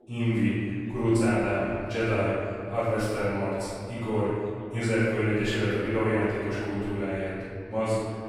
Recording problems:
room echo; strong; dies away in 2.3 s
off-mic speech; far
background chatter; faint; throughout; 2 voices, 30 dB below the speech

